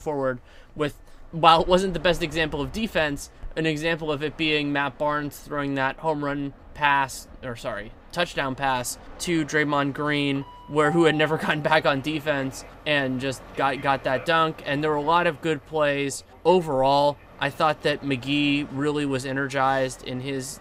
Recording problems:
train or aircraft noise; faint; throughout; 20 dB below the speech

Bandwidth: 15.5 kHz